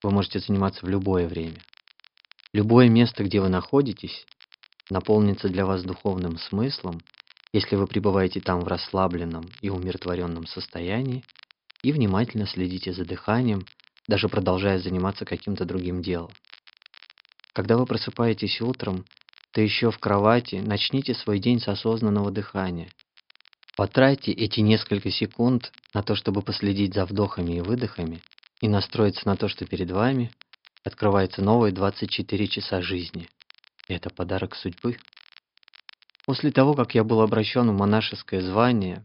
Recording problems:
high frequencies cut off; noticeable; nothing above 5.5 kHz
crackle, like an old record; faint; 25 dB below the speech

